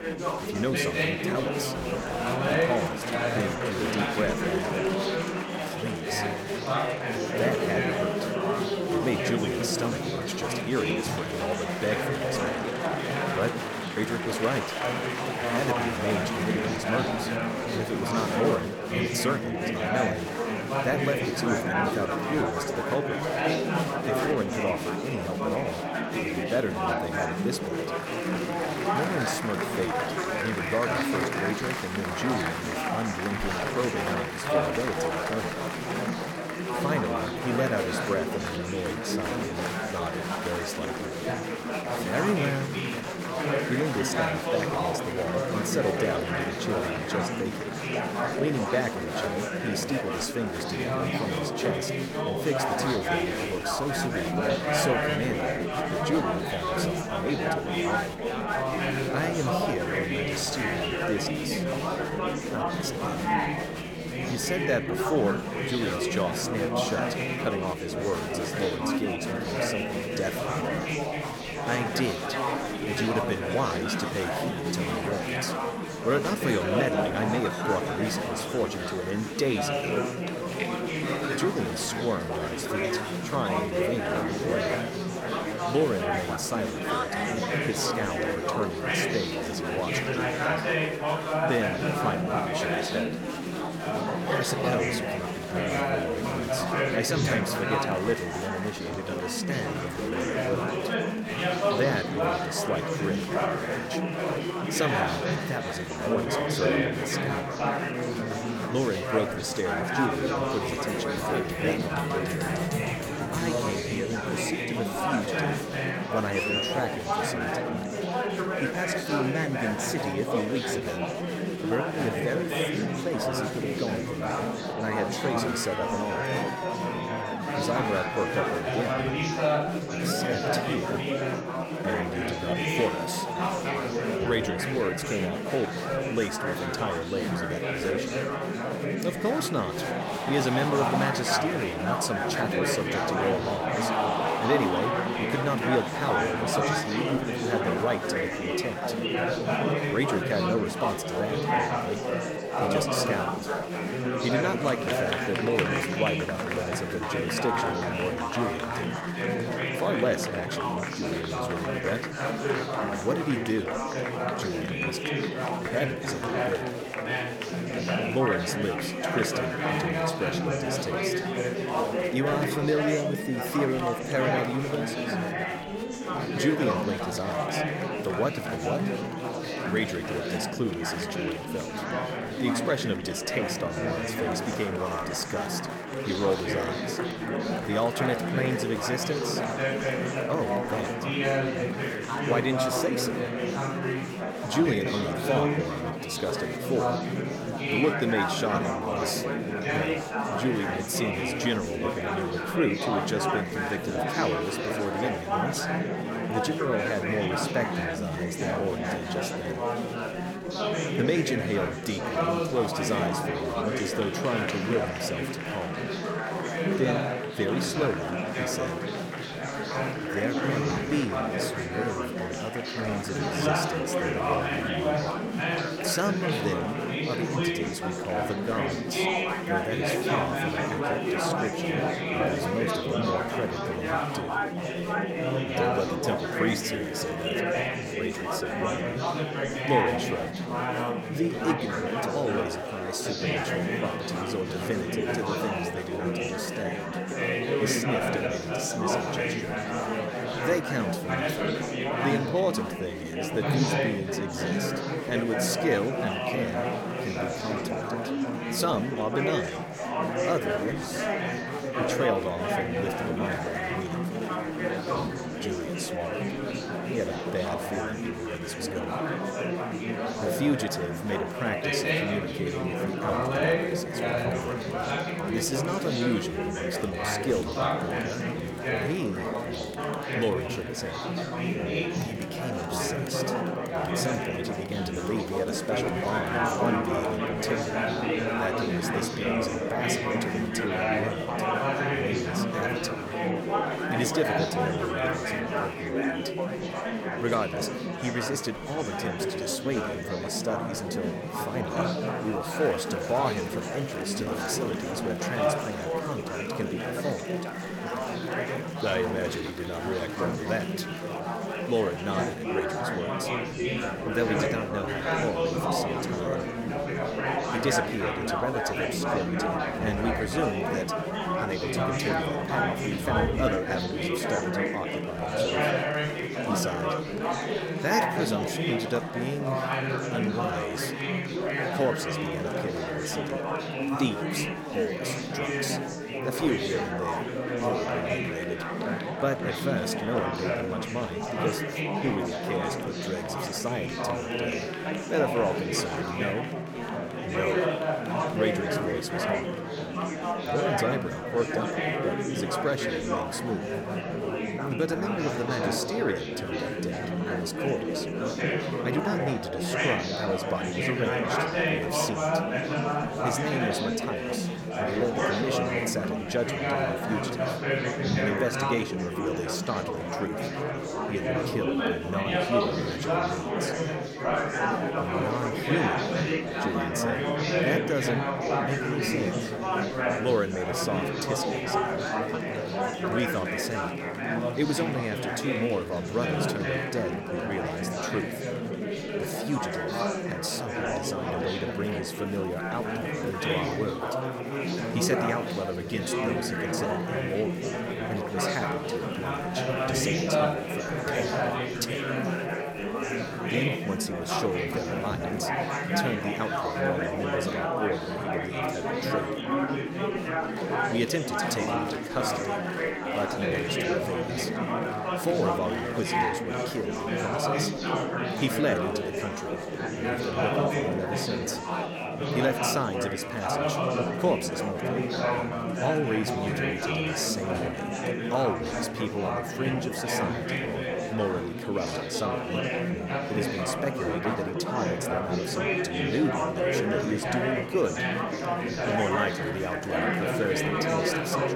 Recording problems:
murmuring crowd; very loud; throughout; 3 dB above the speech

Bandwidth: 17.5 kHz